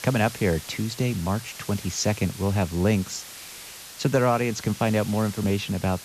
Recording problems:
high frequencies cut off; noticeable; nothing above 8 kHz
hiss; noticeable; throughout; 15 dB below the speech

